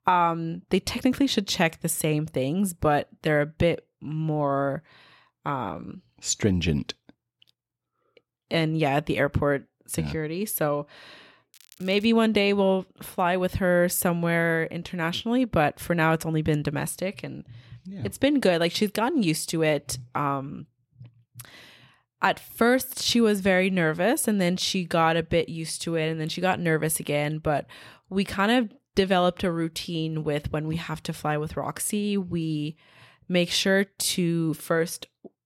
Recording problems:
crackling; faint; at 12 s; 25 dB below the speech

